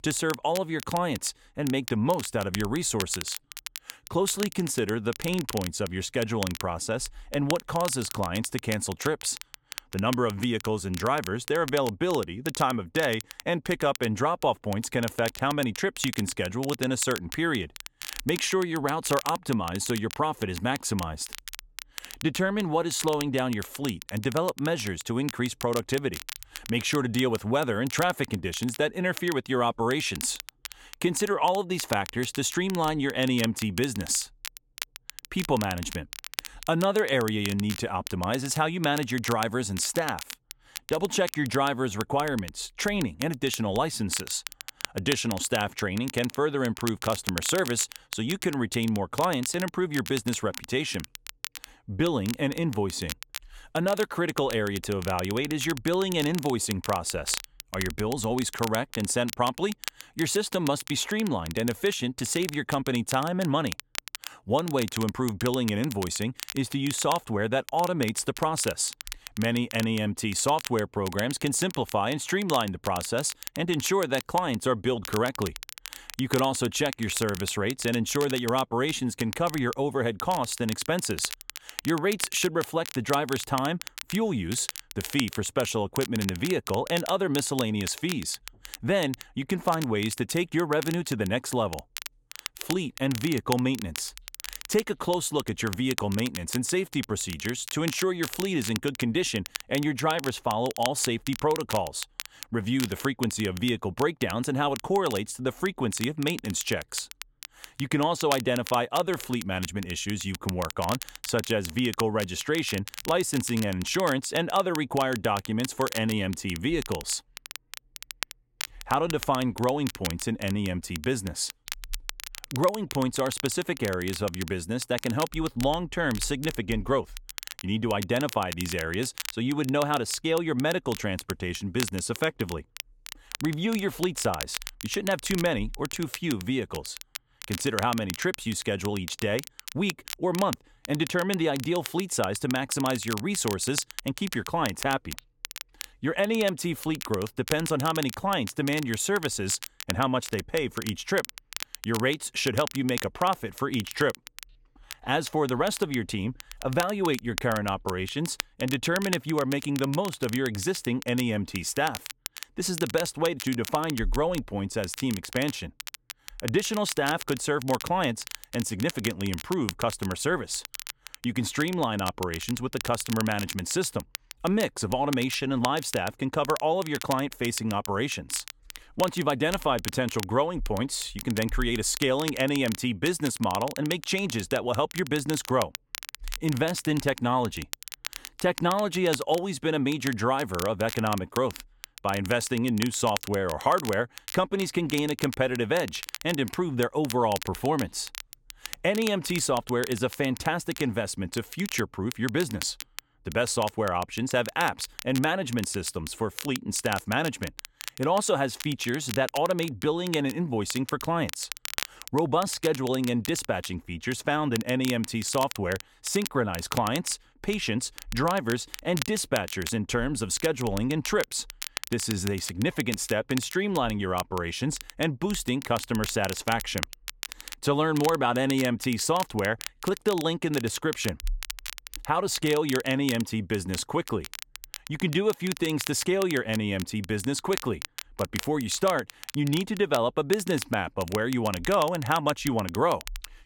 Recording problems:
crackle, like an old record; noticeable; 10 dB below the speech

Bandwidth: 17 kHz